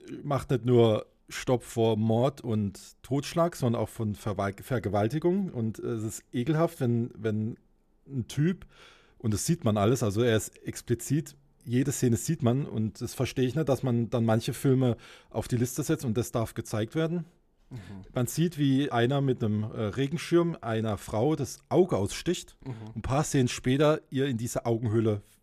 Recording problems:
none

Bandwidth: 14.5 kHz